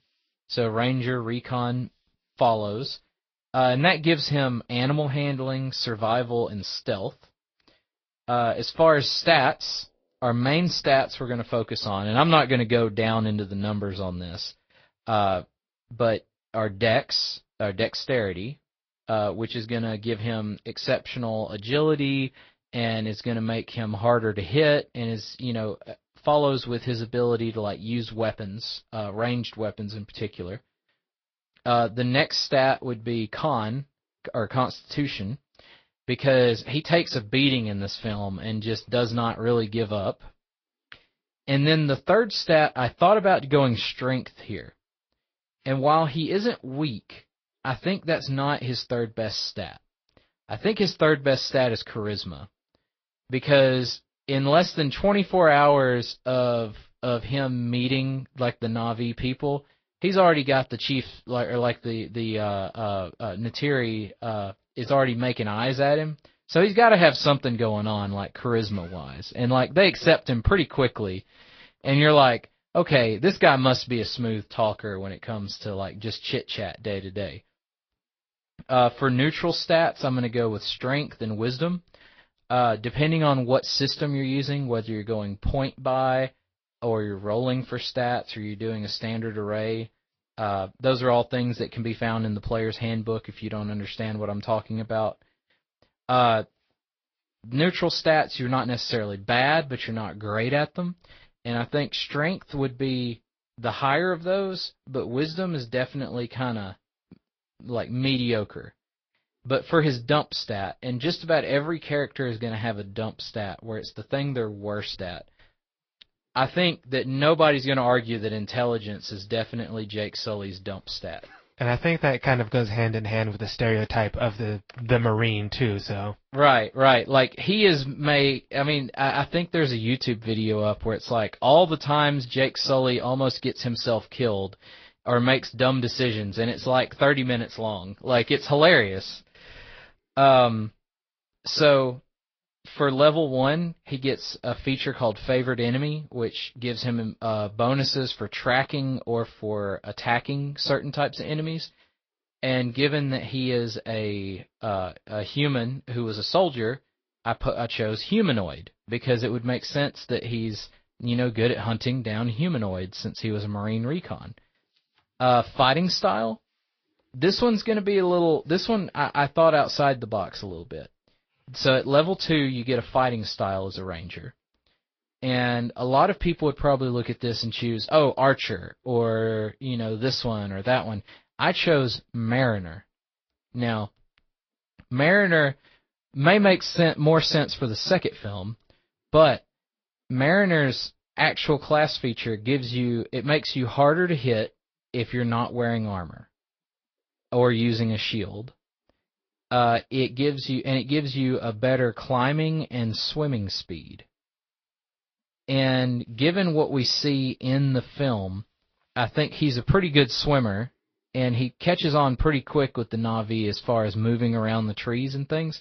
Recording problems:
high frequencies cut off; noticeable; nothing above 5.5 kHz
garbled, watery; slightly

